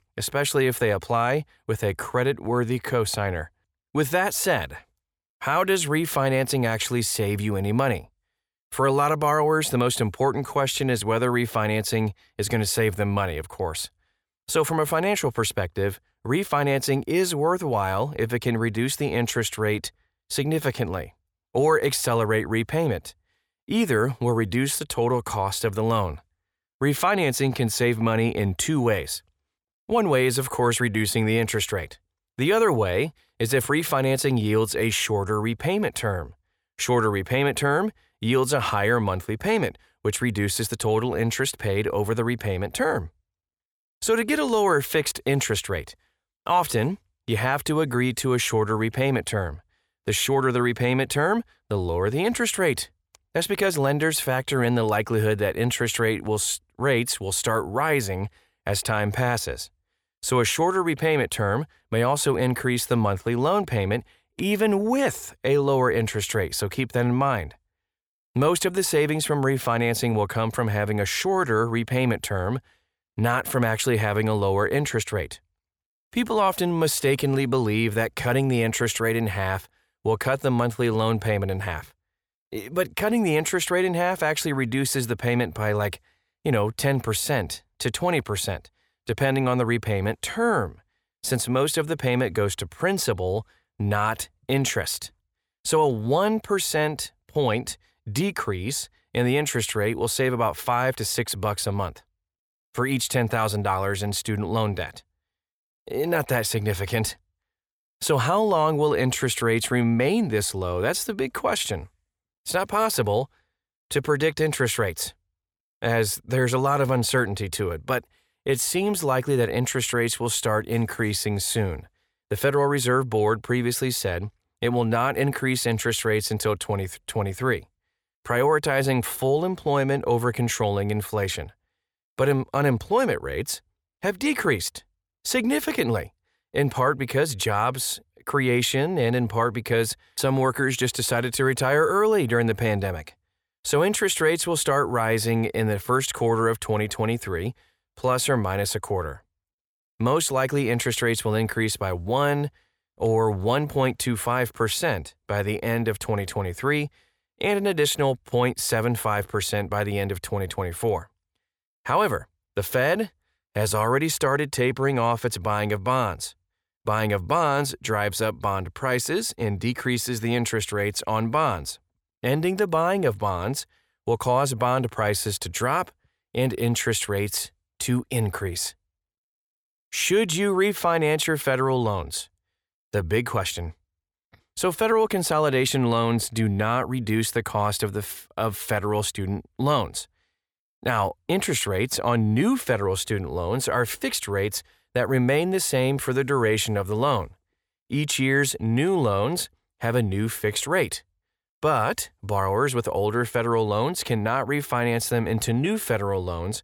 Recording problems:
none

